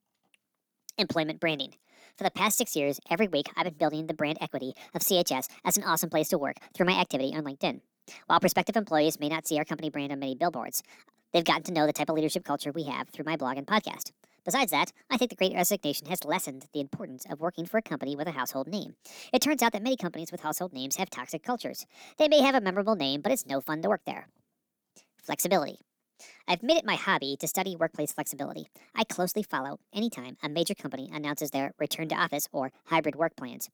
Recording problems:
wrong speed and pitch; too fast and too high; 1.5 times normal speed

